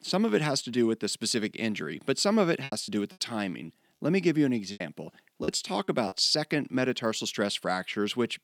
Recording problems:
choppy; very; at 2.5 s and from 4.5 to 6 s; 15% of the speech affected

